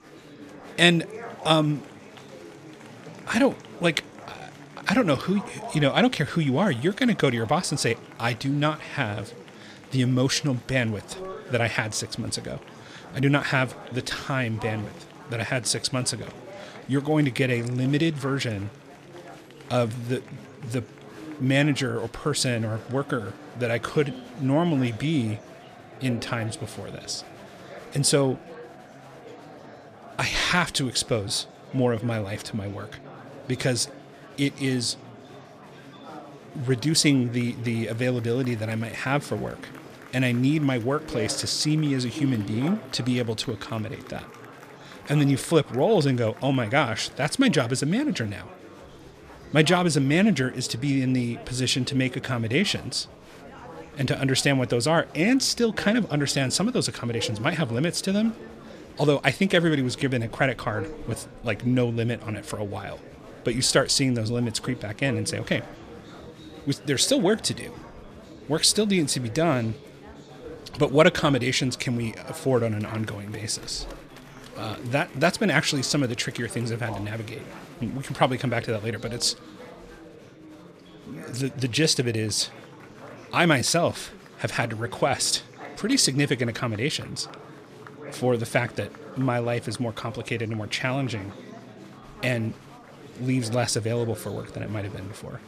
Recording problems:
chatter from many people; noticeable; throughout; 20 dB below the speech

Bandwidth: 14.5 kHz